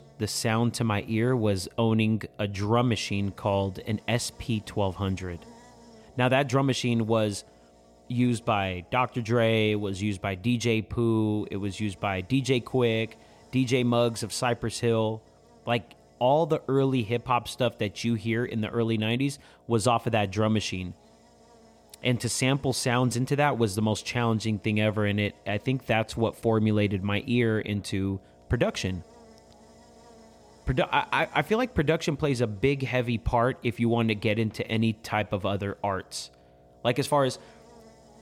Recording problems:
electrical hum; faint; throughout; 60 Hz, 30 dB below the speech

